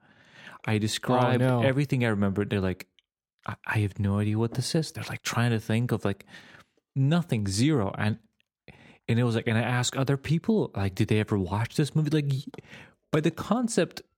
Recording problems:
none

